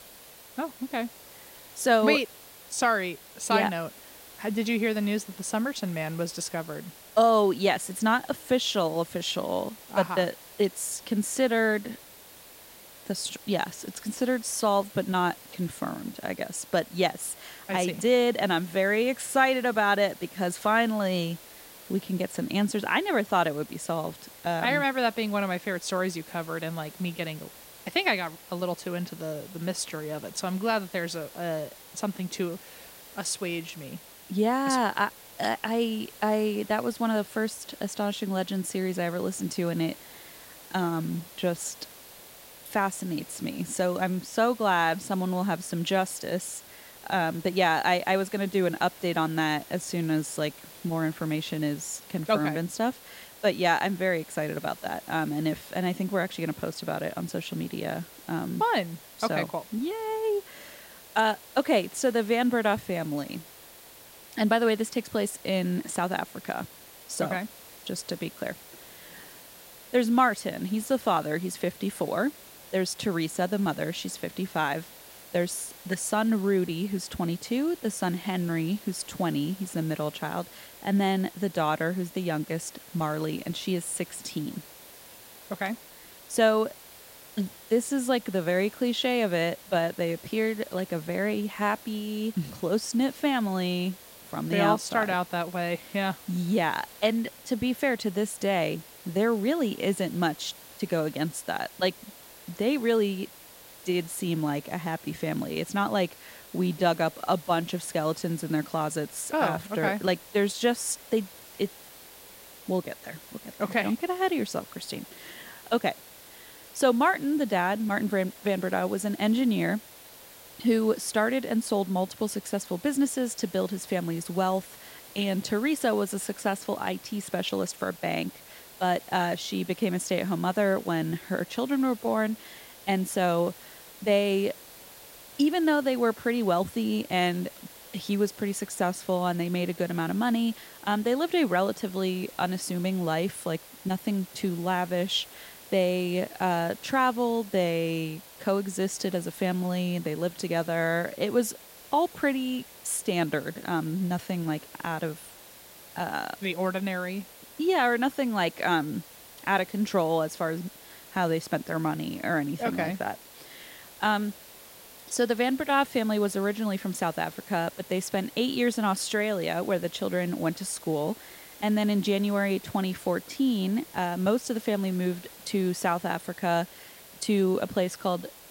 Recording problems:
hiss; noticeable; throughout; 20 dB below the speech

